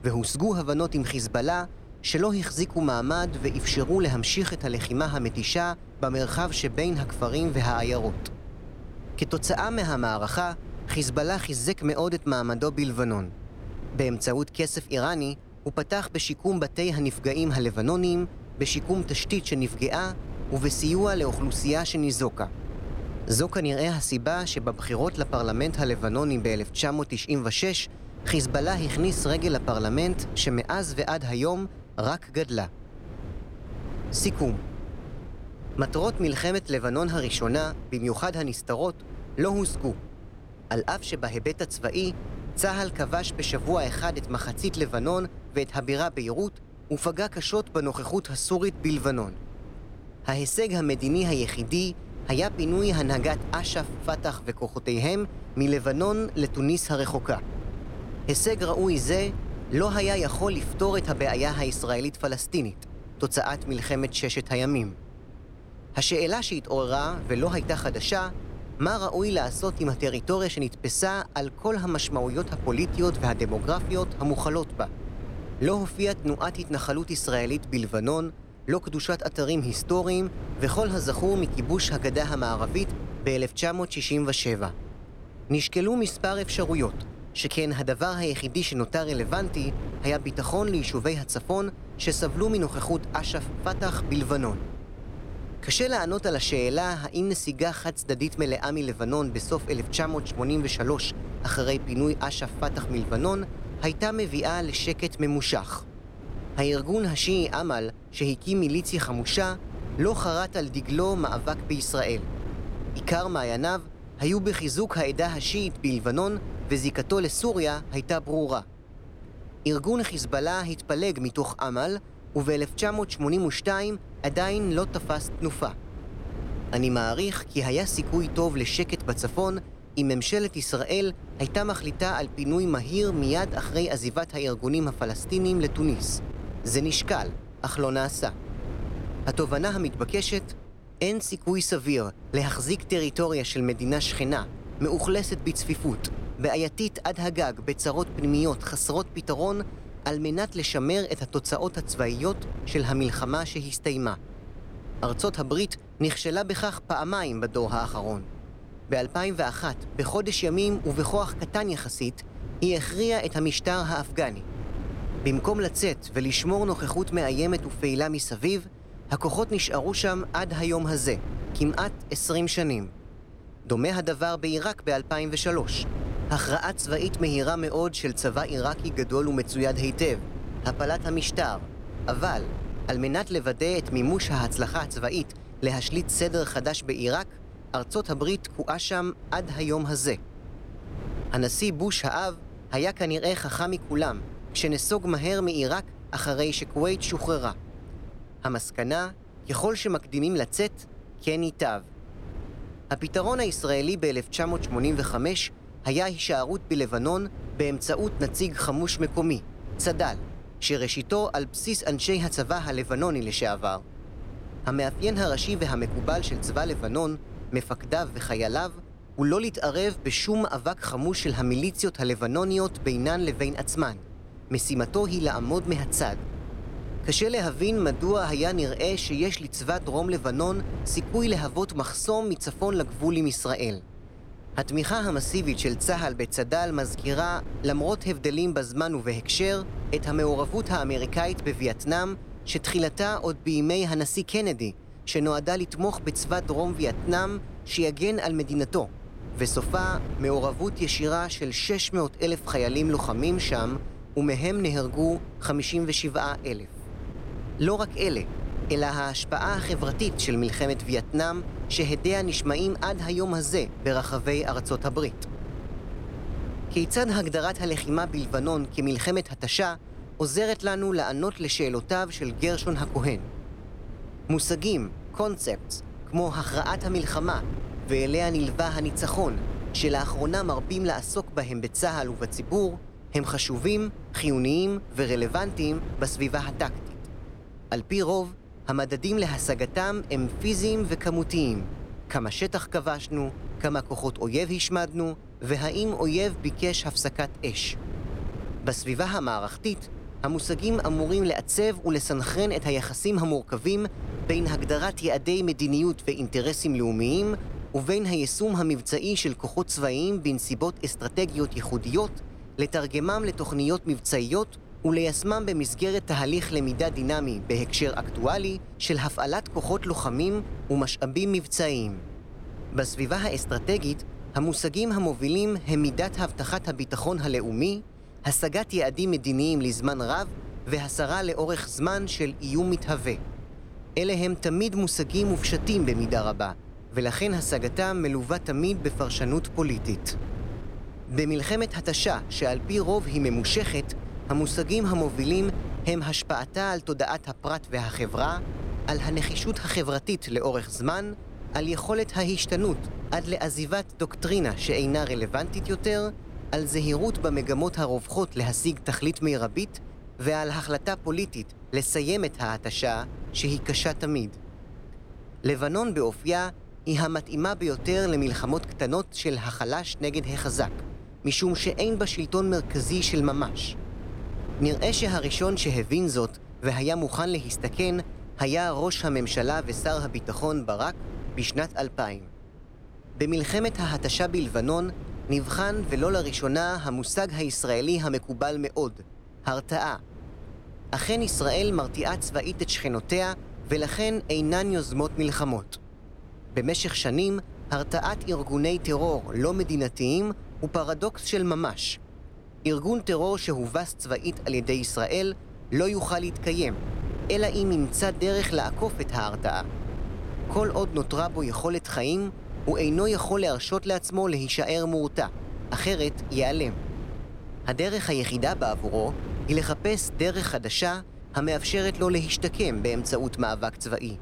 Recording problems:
wind noise on the microphone; occasional gusts; 15 dB below the speech

